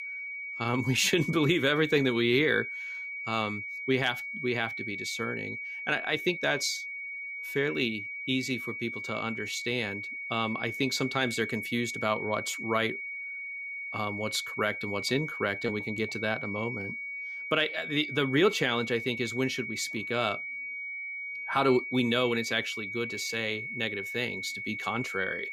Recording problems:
high-pitched whine; loud; throughout; 2.5 kHz, 5 dB below the speech

